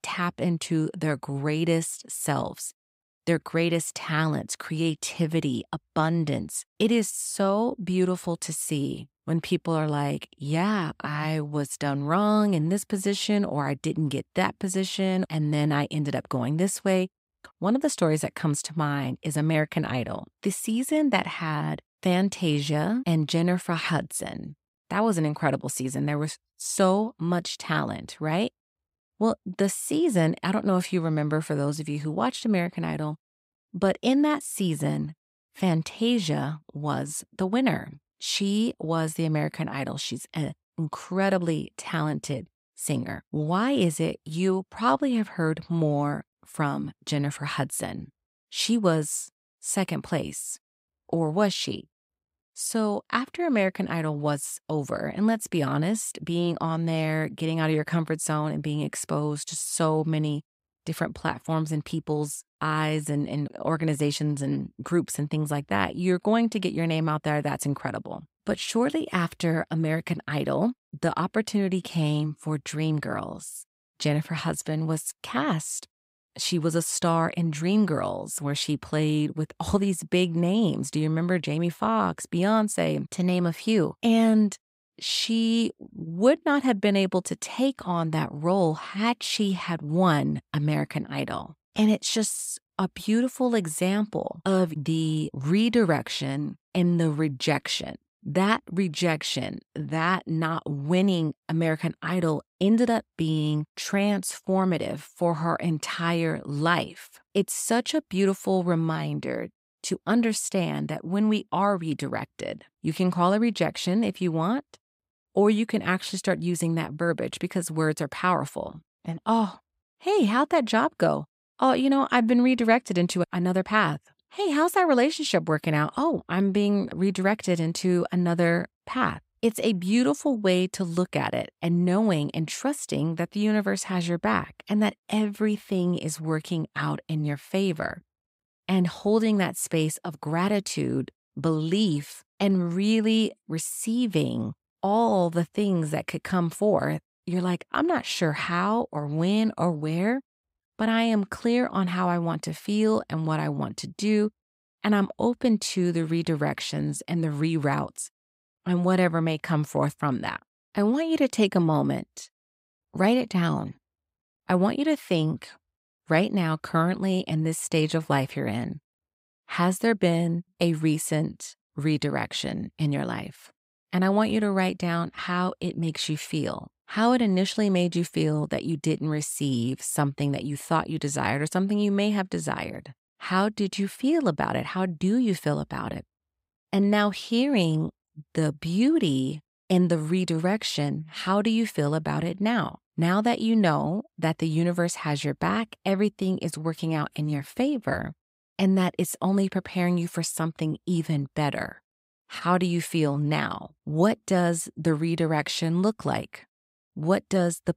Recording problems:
none

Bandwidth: 15.5 kHz